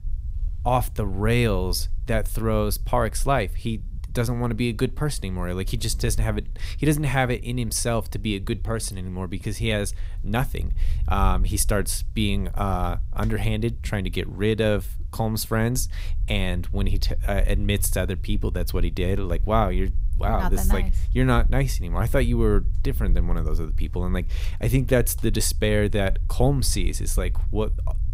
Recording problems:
low rumble; faint; throughout; 25 dB below the speech

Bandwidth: 15.5 kHz